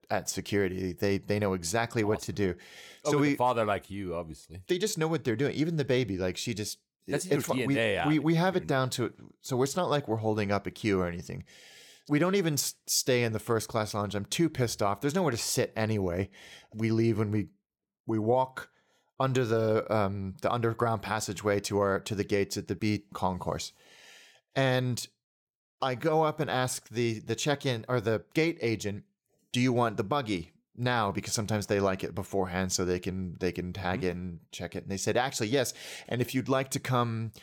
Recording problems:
none

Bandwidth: 17 kHz